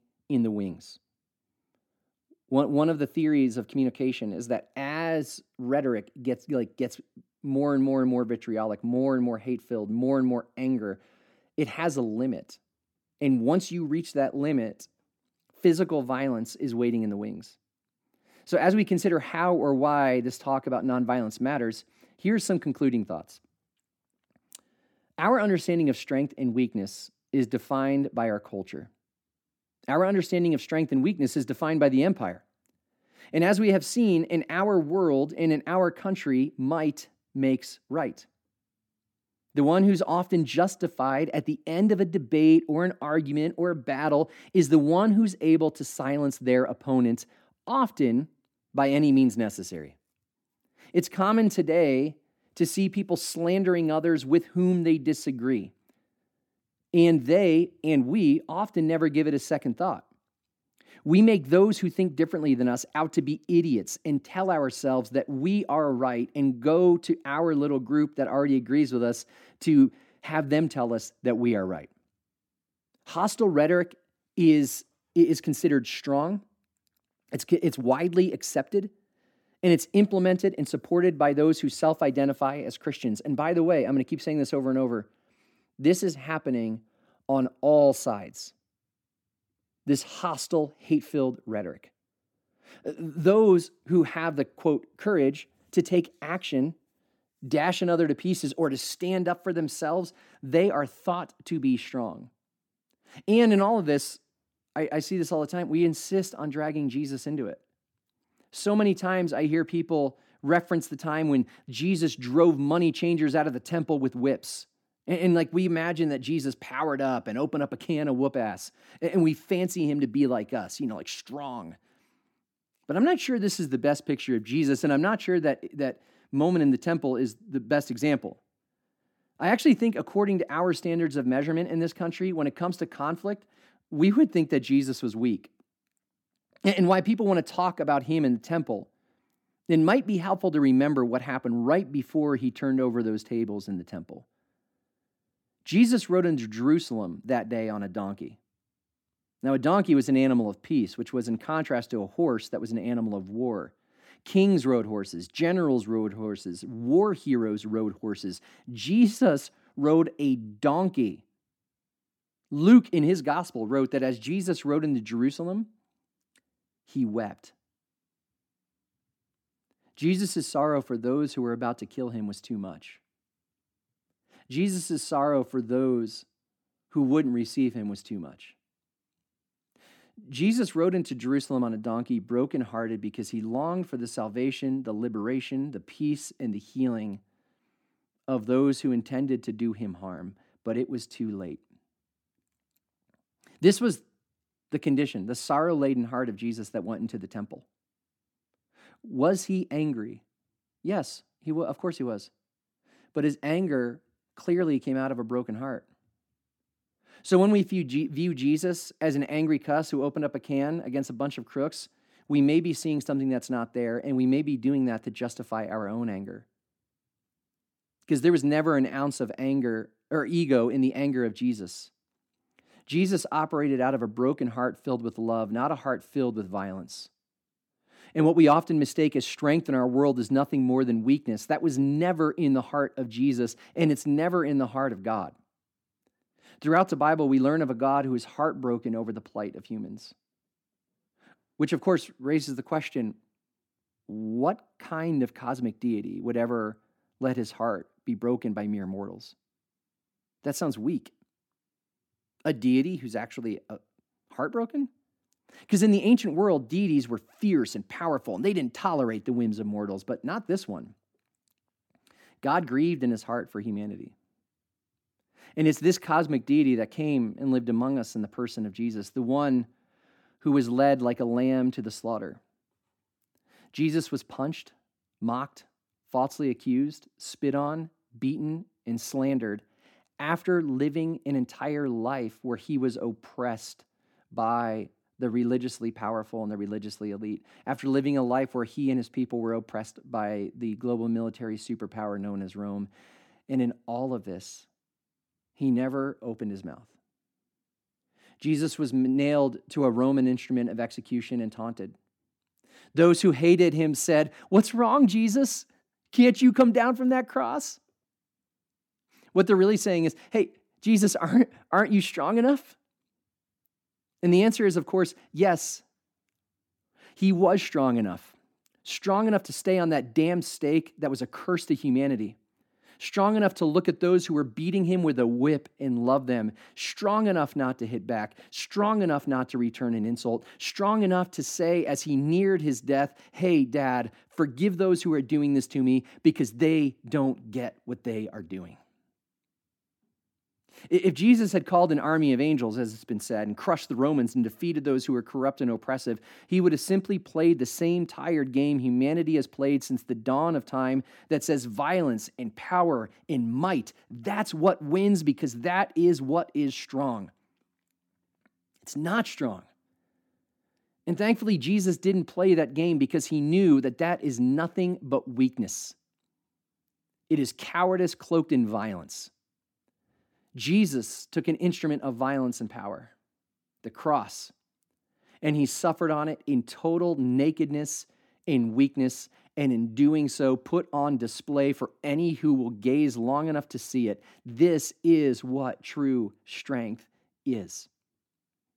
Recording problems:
none

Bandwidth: 17 kHz